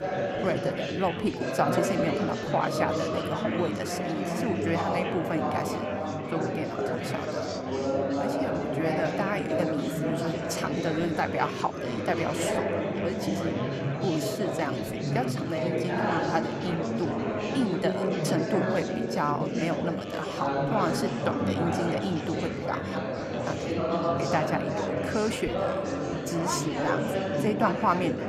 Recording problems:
chatter from many people; very loud; throughout; 2 dB above the speech

